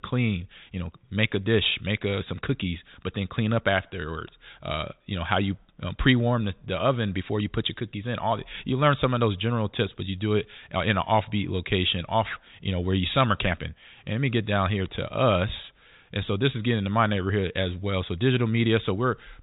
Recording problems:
high frequencies cut off; severe; nothing above 4 kHz

